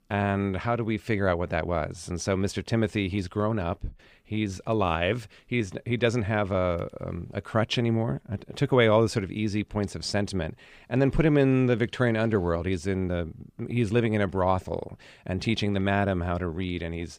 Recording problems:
none

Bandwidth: 15 kHz